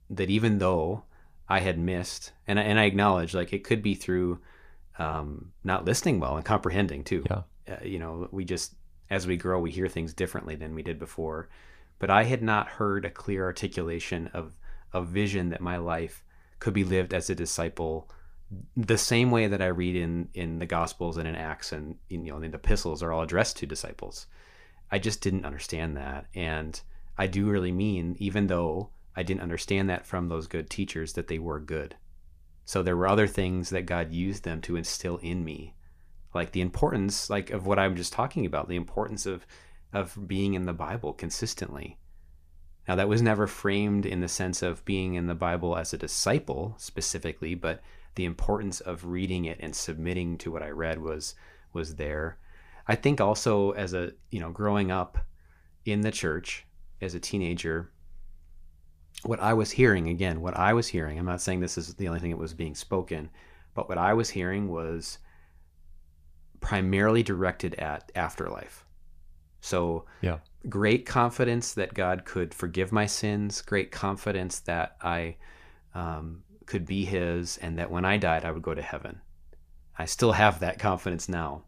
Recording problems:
none

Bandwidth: 15 kHz